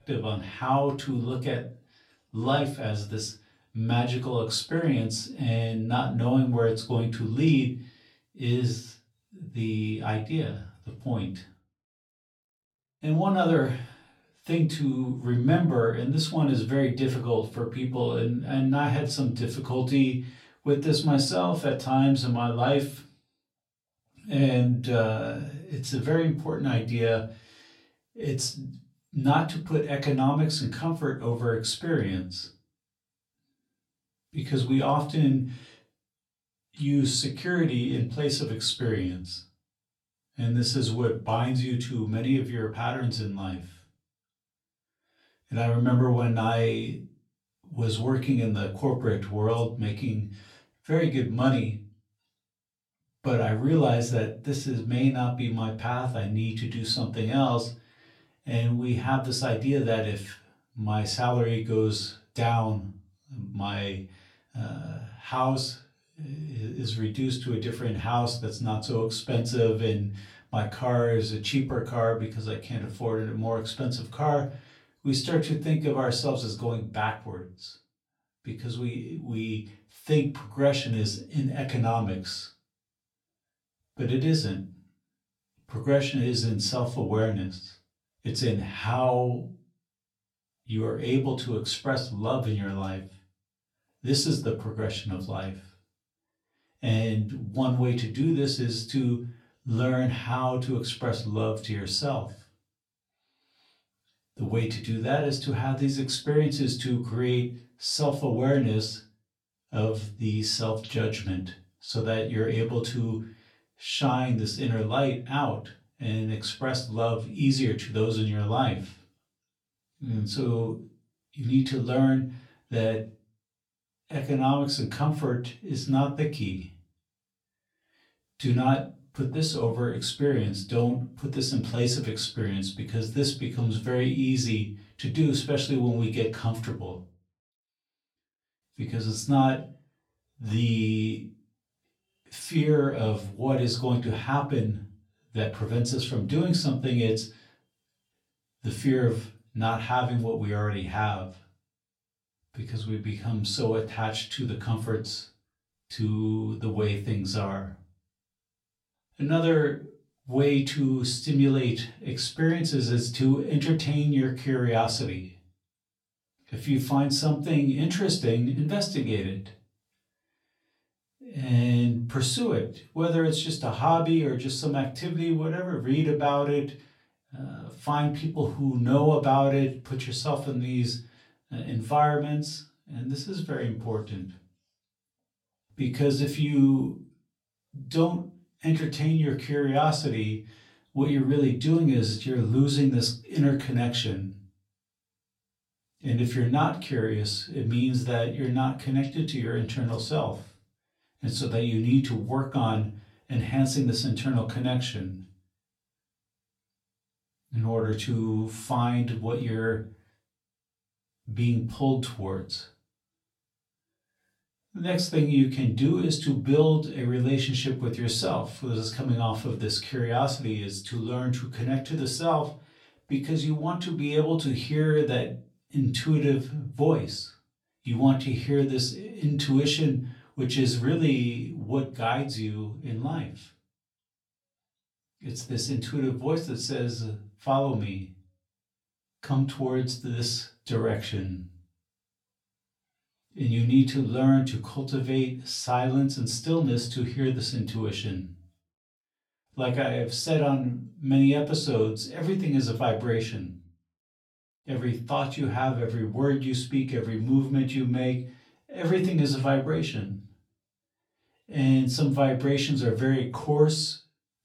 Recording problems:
off-mic speech; far
room echo; very slight; dies away in 0.3 s

